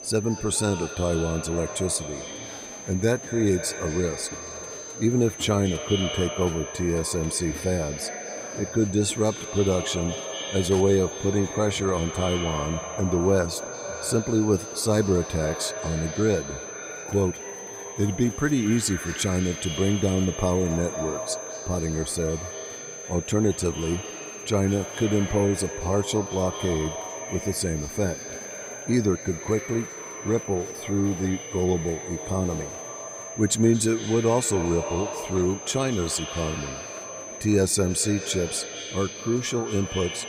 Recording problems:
echo of what is said; strong; throughout; 220 ms later, 10 dB below the speech
high-pitched whine; noticeable; throughout; 6.5 kHz, 10 dB below the speech
murmuring crowd; noticeable; throughout; 20 dB below the speech

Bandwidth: 15.5 kHz